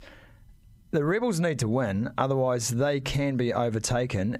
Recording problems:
squashed, flat; heavily

